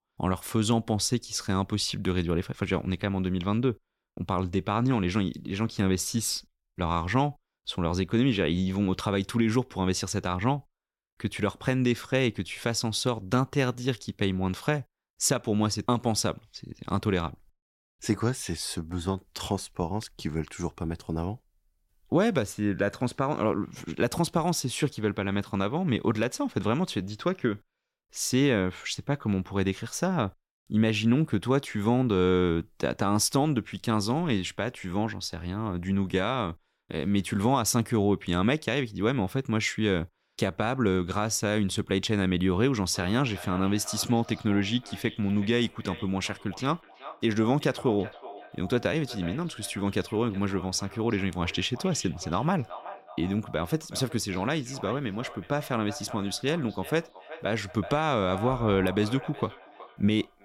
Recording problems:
echo of what is said; noticeable; from 43 s on; 370 ms later, 15 dB below the speech

